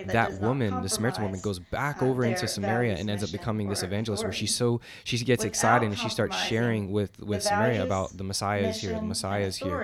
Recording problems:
voice in the background; loud; throughout; 6 dB below the speech

